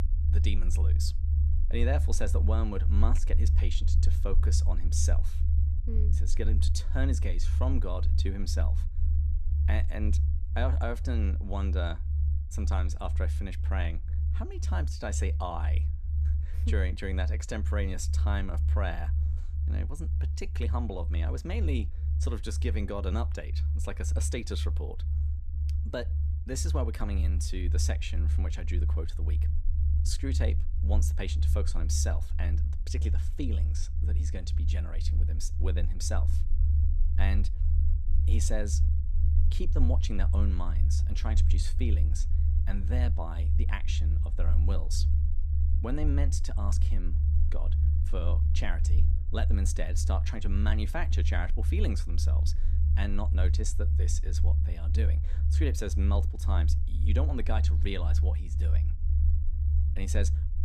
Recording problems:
low rumble; loud; throughout; 7 dB below the speech

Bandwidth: 14.5 kHz